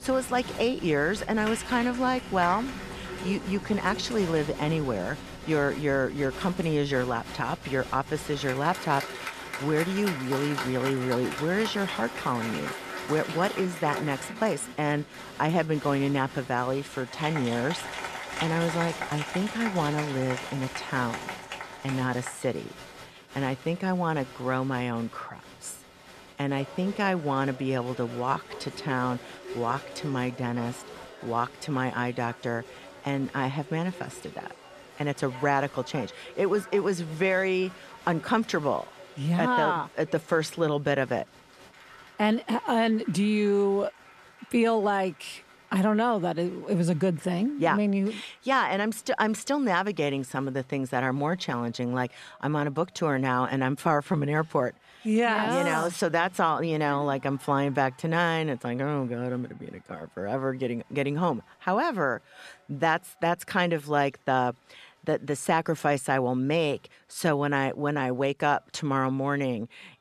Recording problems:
crowd noise; noticeable; throughout; 10 dB below the speech

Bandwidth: 14 kHz